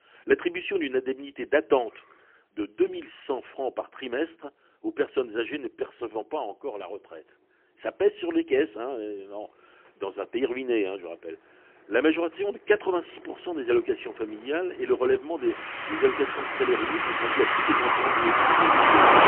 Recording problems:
phone-call audio; poor line; nothing above 3 kHz
traffic noise; very loud; throughout; 6 dB above the speech

